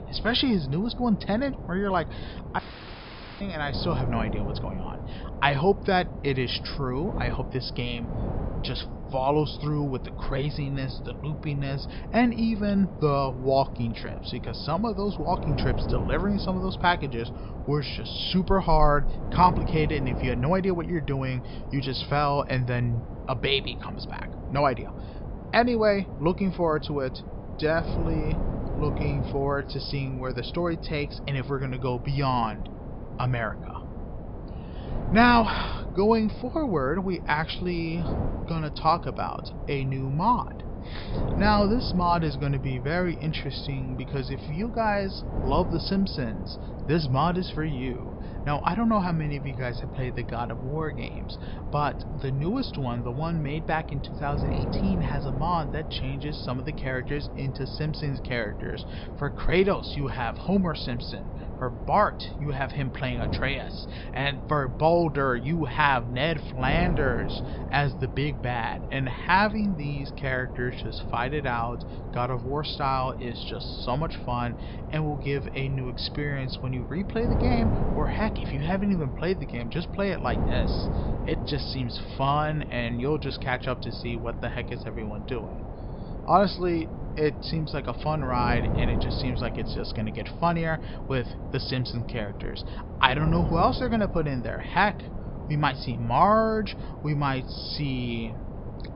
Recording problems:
high frequencies cut off; noticeable; nothing above 5.5 kHz
wind noise on the microphone; occasional gusts; 15 dB below the speech
audio cutting out; at 2.5 s for 1 s

